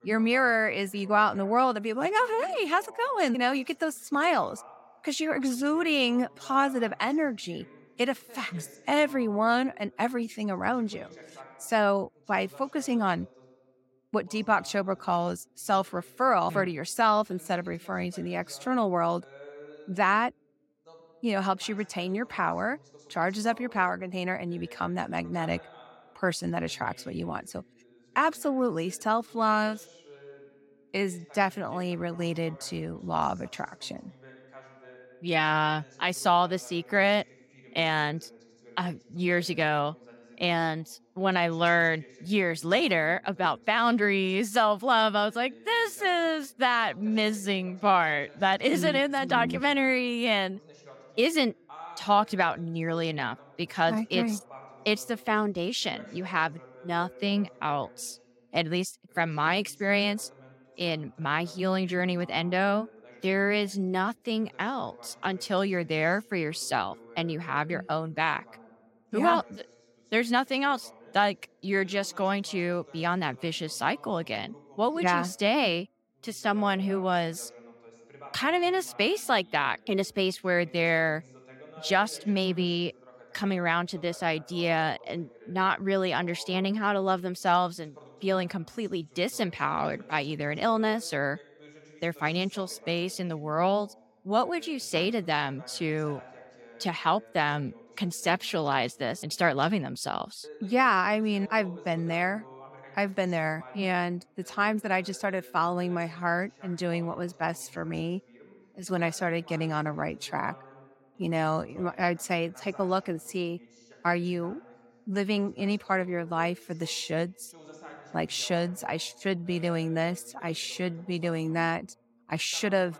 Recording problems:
voice in the background; faint; throughout; 25 dB below the speech

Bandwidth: 16.5 kHz